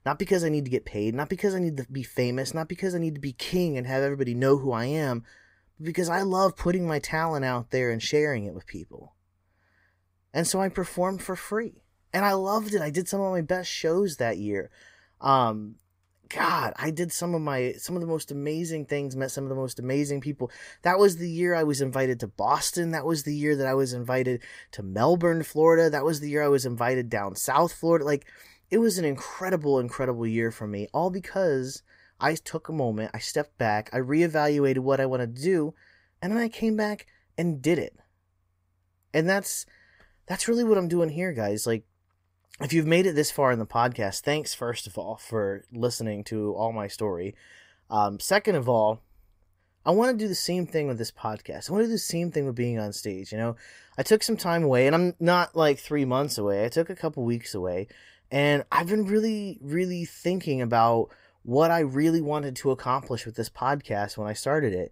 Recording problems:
none

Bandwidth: 15.5 kHz